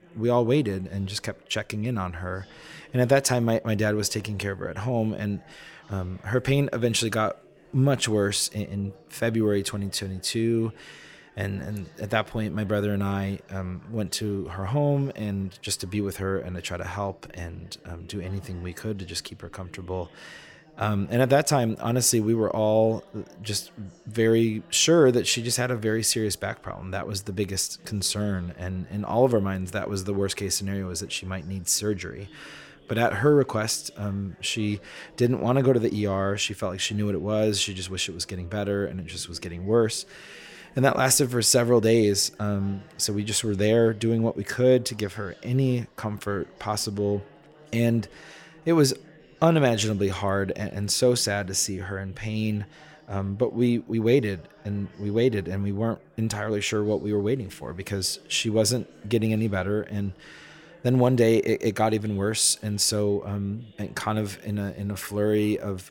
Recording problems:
background chatter; faint; throughout; 4 voices, 25 dB below the speech

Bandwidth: 16.5 kHz